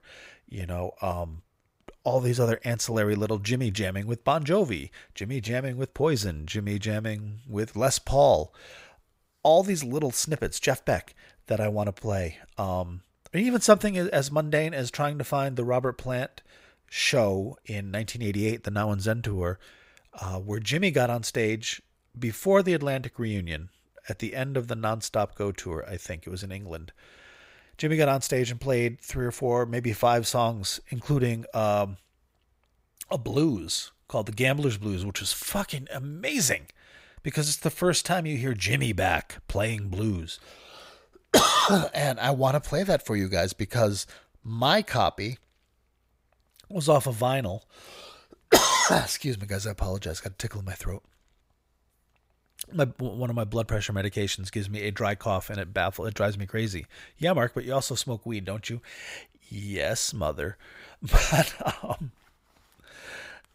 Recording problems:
none

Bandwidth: 15.5 kHz